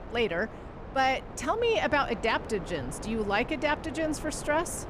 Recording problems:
wind noise on the microphone; occasional gusts; 15 dB below the speech

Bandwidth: 14.5 kHz